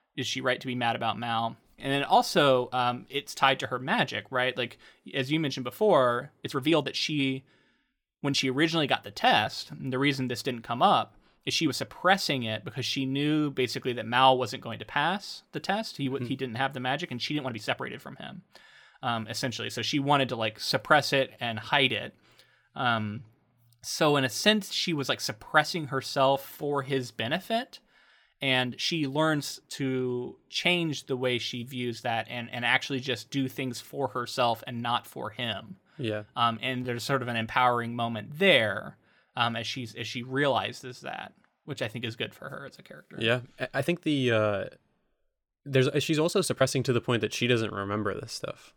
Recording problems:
uneven, jittery; strongly; from 1.5 to 47 s

